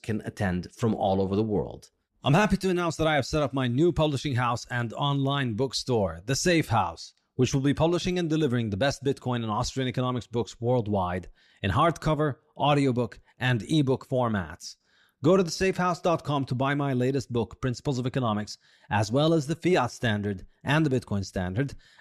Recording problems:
none

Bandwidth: 13.5 kHz